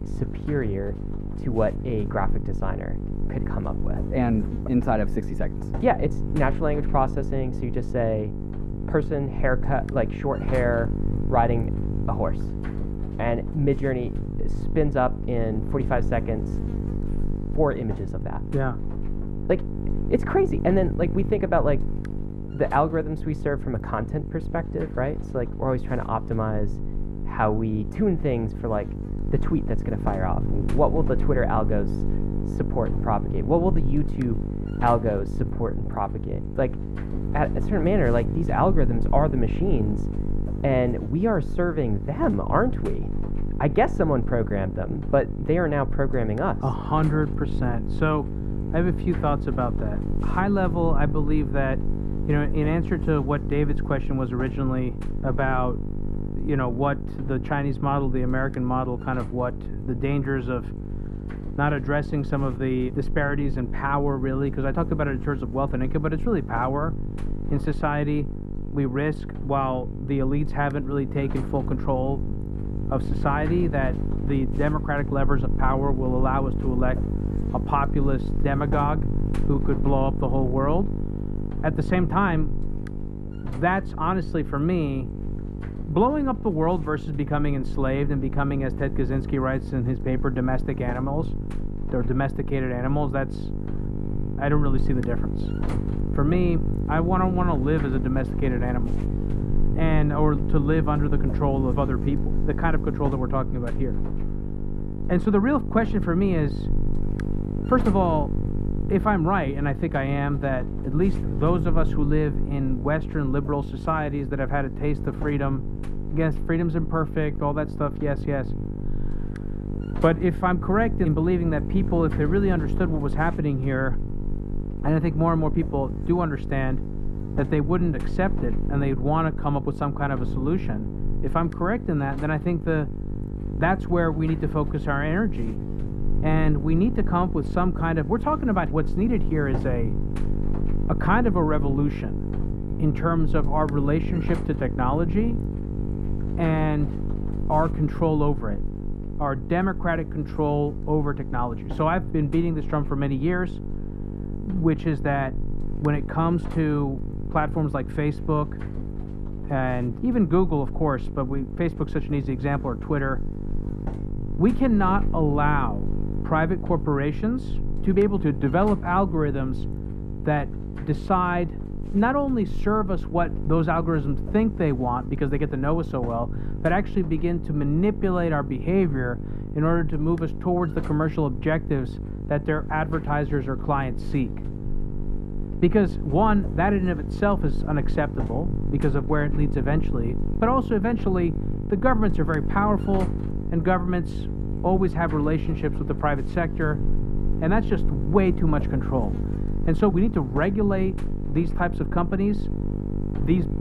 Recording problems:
muffled; very; fading above 2.5 kHz
electrical hum; noticeable; throughout; 50 Hz, 10 dB below the speech

